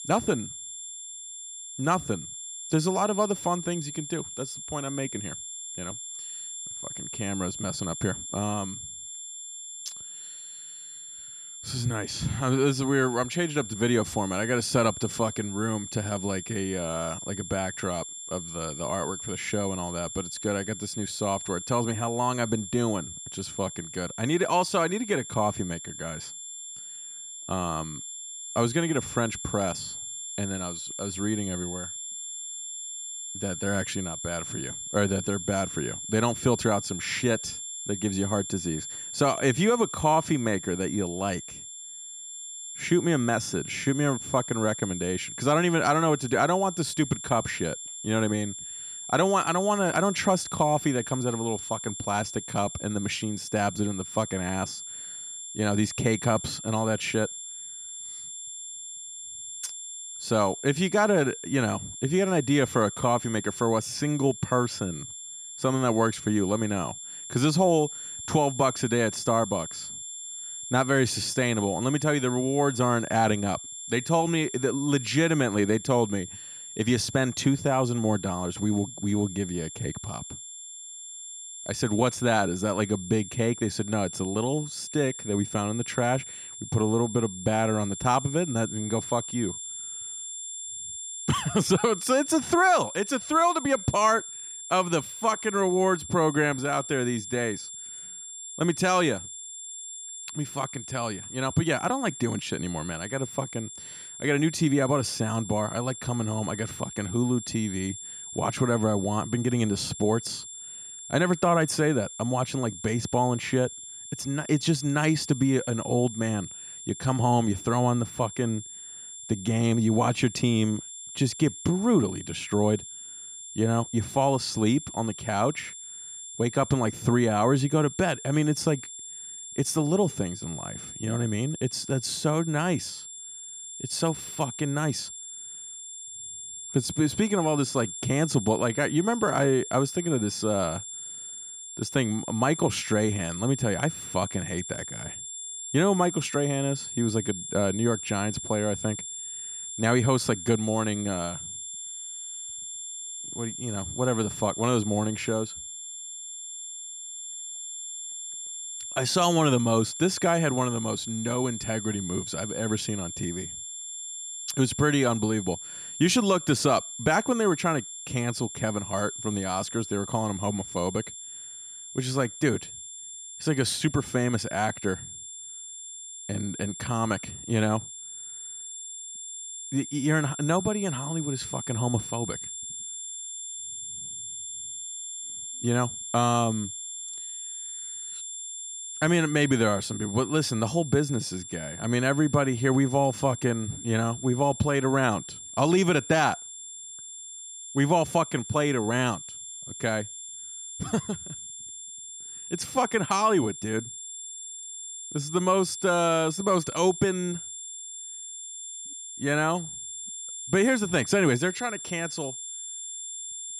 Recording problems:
high-pitched whine; loud; throughout; 7.5 kHz, 9 dB below the speech

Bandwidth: 14.5 kHz